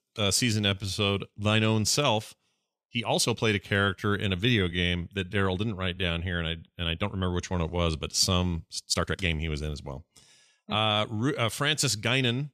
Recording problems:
uneven, jittery; strongly; from 0.5 to 11 s

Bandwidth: 14.5 kHz